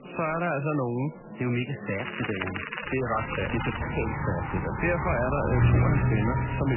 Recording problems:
garbled, watery; badly; nothing above 3 kHz
traffic noise; very loud; from 3 s on; 1 dB above the speech
crackling; loud; from 2 to 4 s; 5 dB below the speech
murmuring crowd; noticeable; throughout; 10 dB below the speech
abrupt cut into speech; at the end

